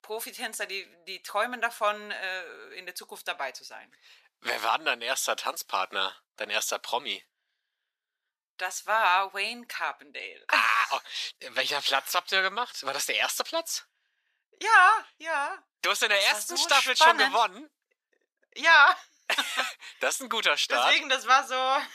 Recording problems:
thin; very; fading below 950 Hz

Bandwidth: 14.5 kHz